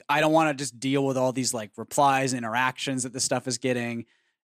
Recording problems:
none

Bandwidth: 14.5 kHz